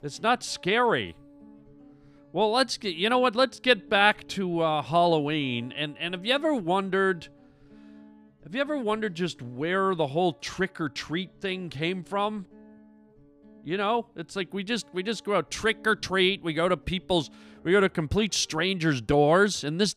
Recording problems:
background music; faint; throughout; 30 dB below the speech

